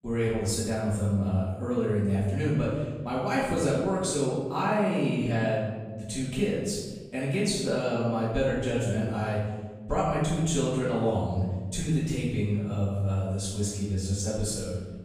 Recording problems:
room echo; strong; dies away in 1.3 s
off-mic speech; far

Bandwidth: 15 kHz